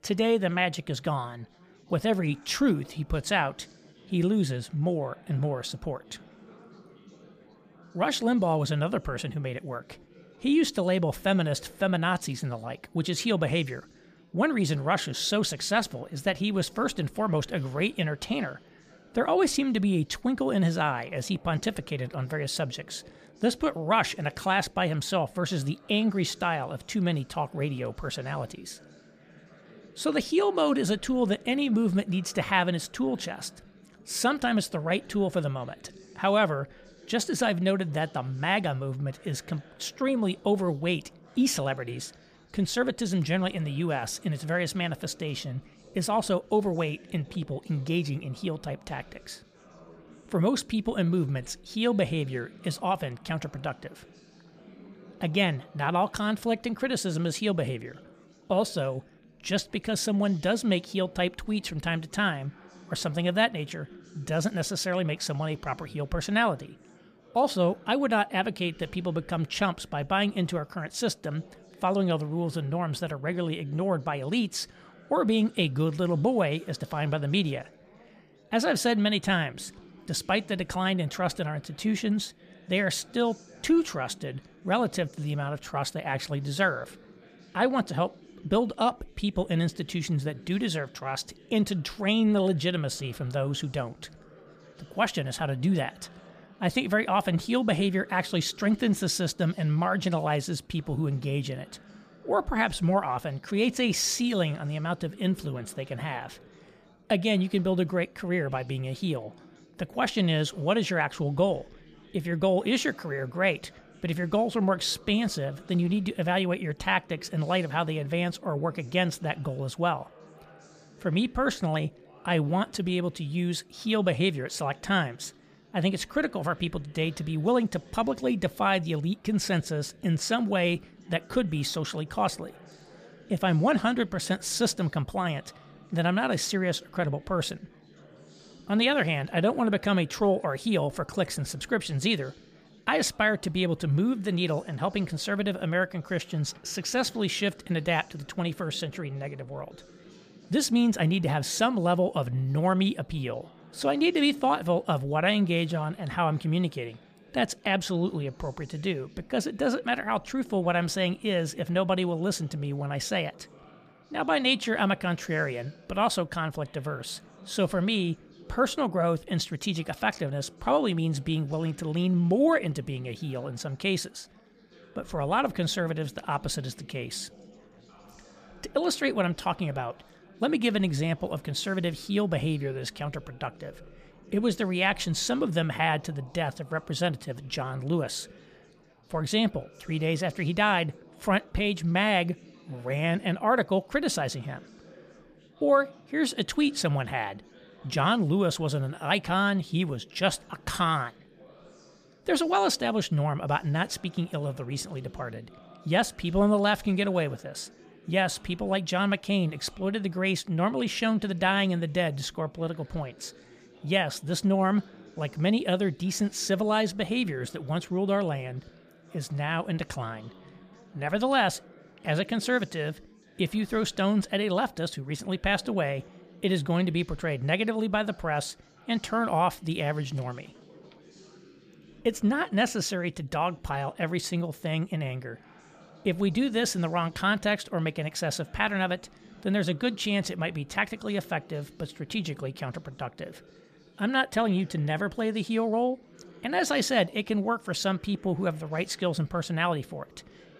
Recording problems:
chatter from many people; faint; throughout; 25 dB below the speech

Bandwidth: 15 kHz